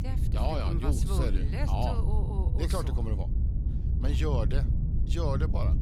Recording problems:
low rumble; loud; throughout; 7 dB below the speech

